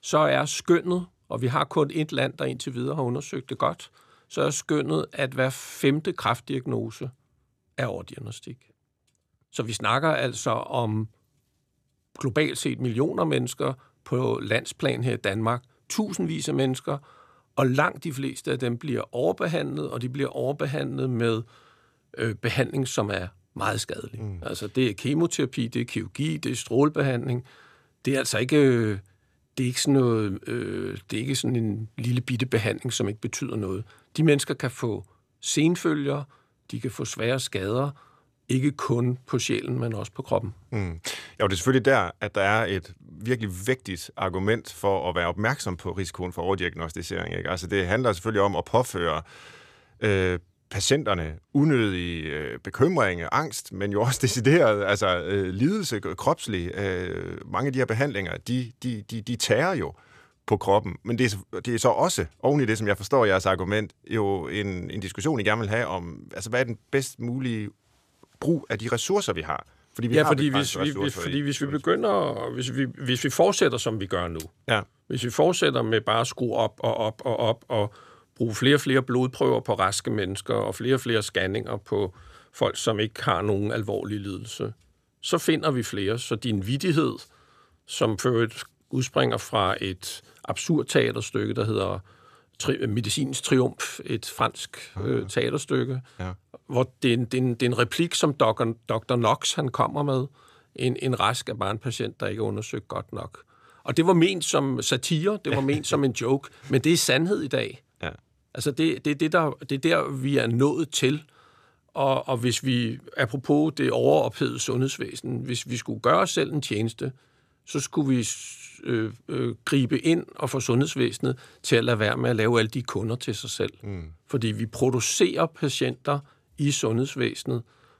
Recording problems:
none

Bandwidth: 14.5 kHz